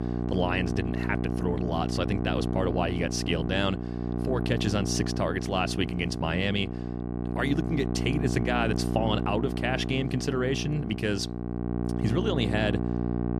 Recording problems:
electrical hum; loud; throughout; 60 Hz, 6 dB below the speech

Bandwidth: 14 kHz